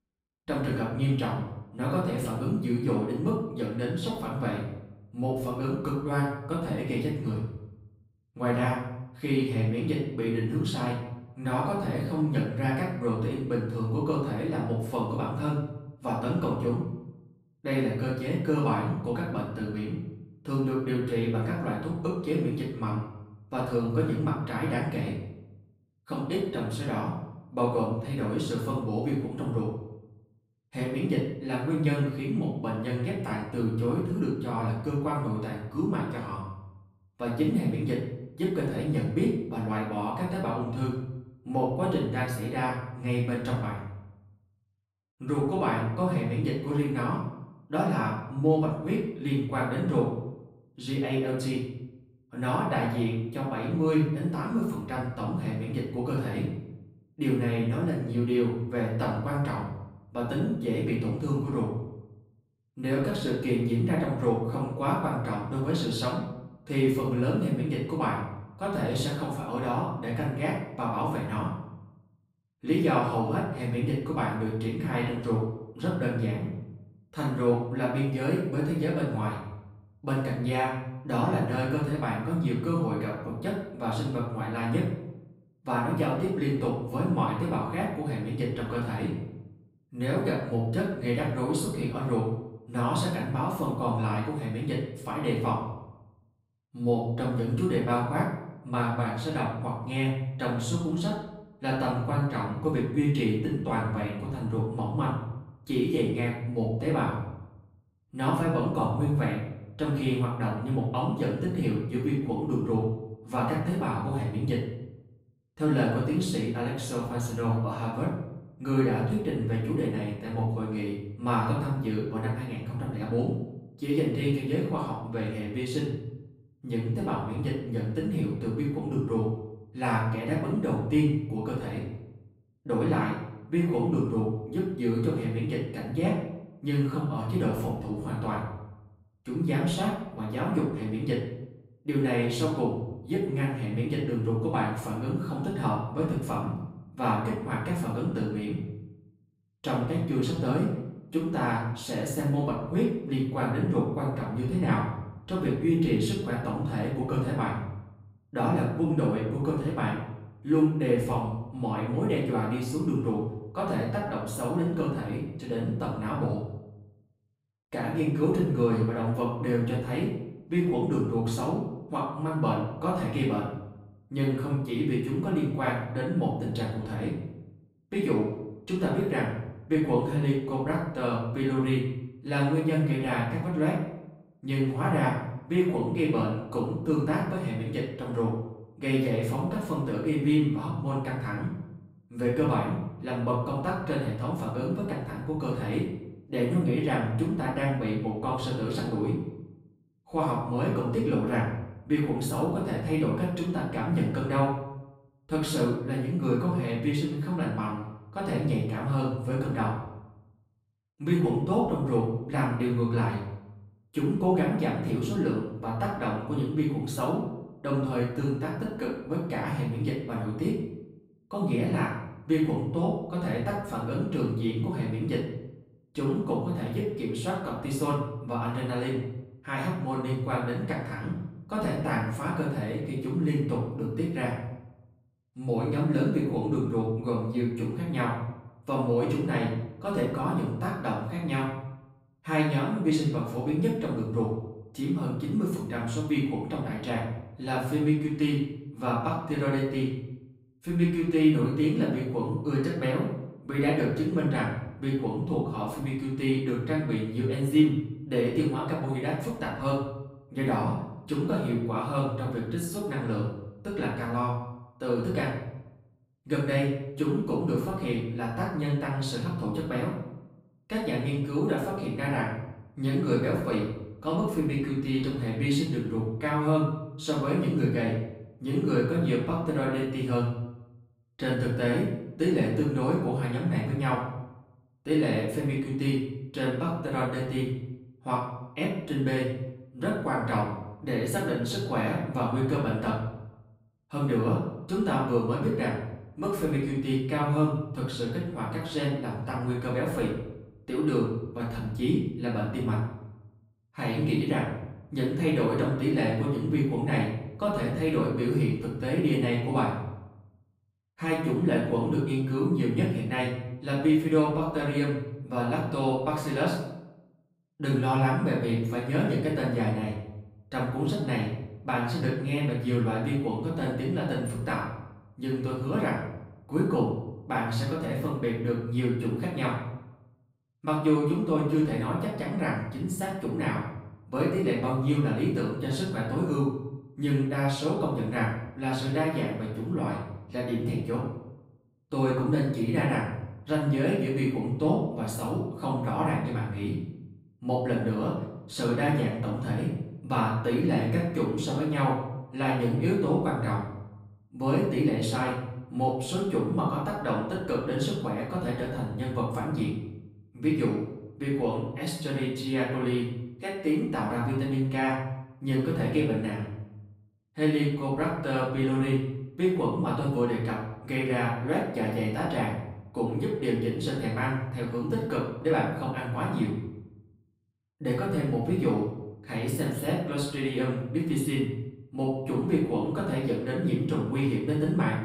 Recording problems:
off-mic speech; far
room echo; noticeable; dies away in 0.7 s

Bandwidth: 15.5 kHz